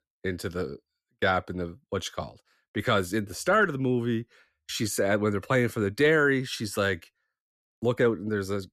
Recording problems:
none

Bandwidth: 14 kHz